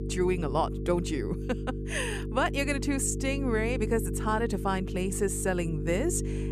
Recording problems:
electrical hum; noticeable; throughout; 50 Hz, 10 dB below the speech

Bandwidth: 14.5 kHz